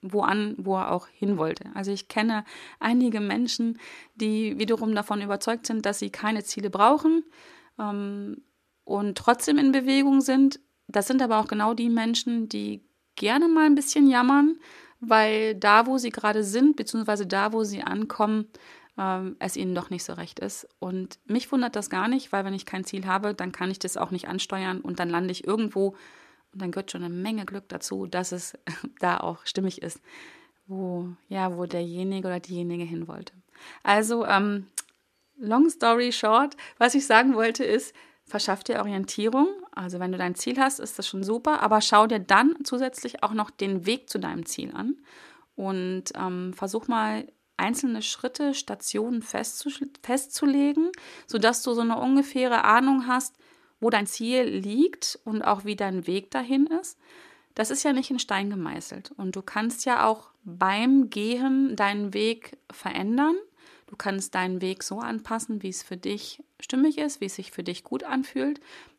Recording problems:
uneven, jittery; strongly; from 8.5 to 54 s

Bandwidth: 14 kHz